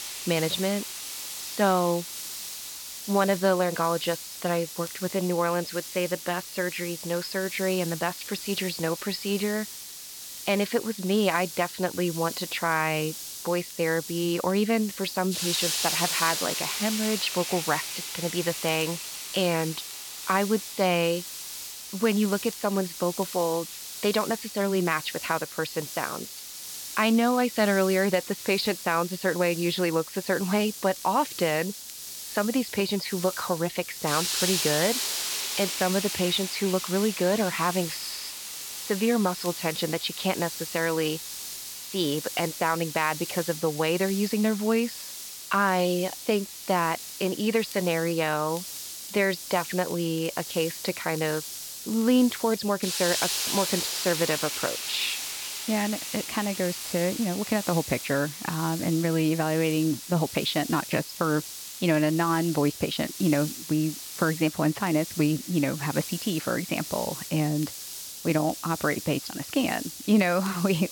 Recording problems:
high frequencies cut off; noticeable; nothing above 5.5 kHz
hiss; loud; throughout; 6 dB below the speech
crackle, like an old record; faint; 25 dB below the speech

